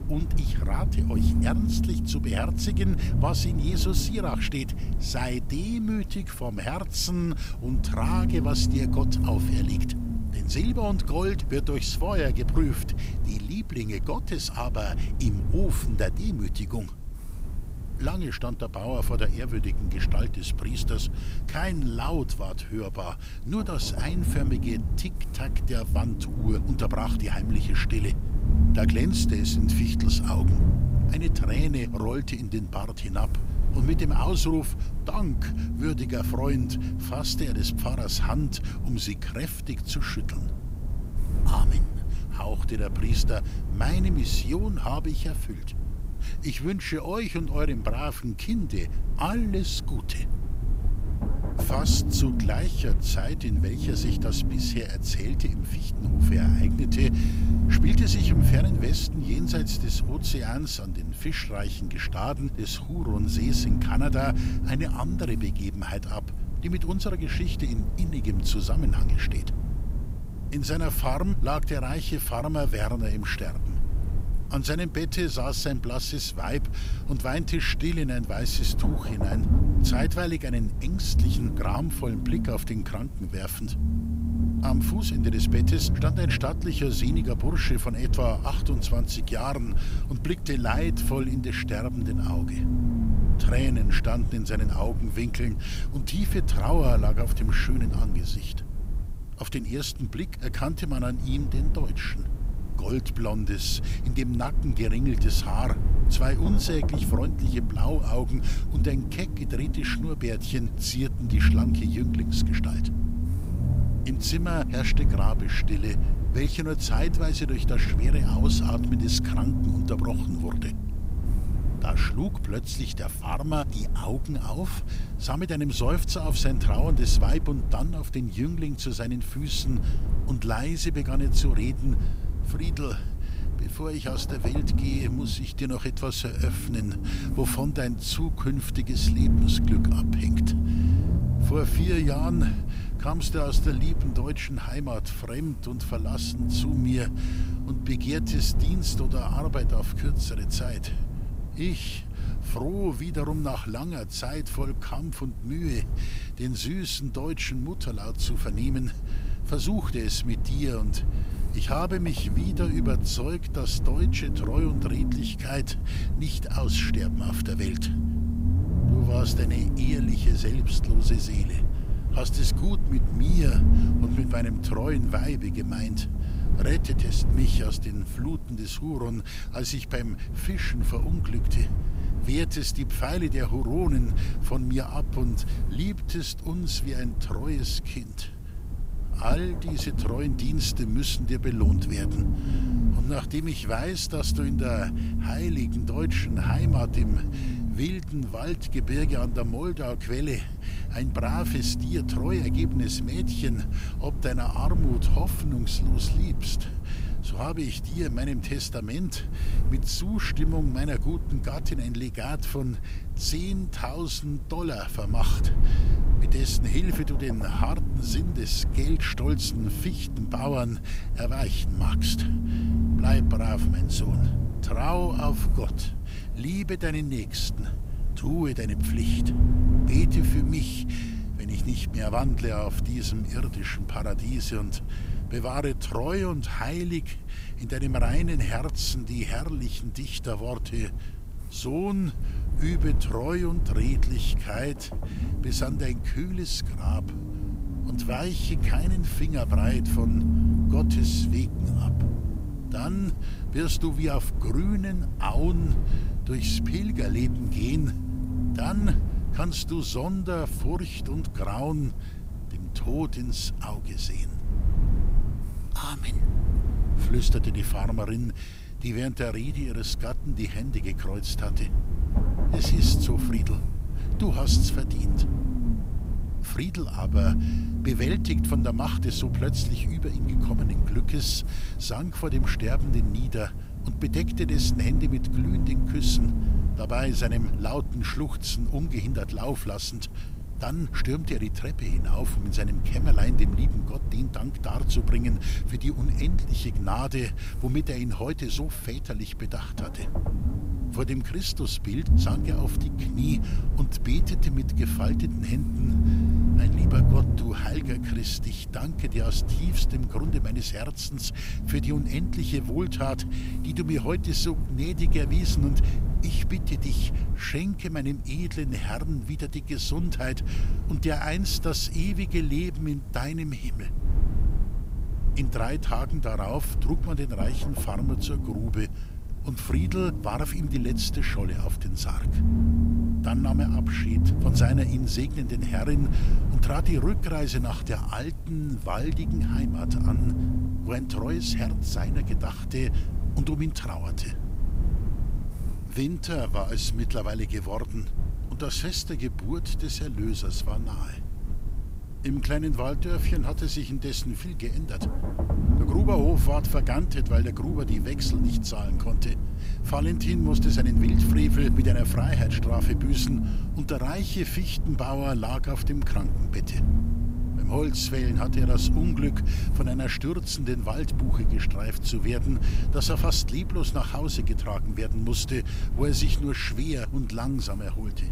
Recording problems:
low rumble; loud; throughout; 6 dB below the speech
hiss; faint; throughout; 25 dB below the speech

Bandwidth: 15.5 kHz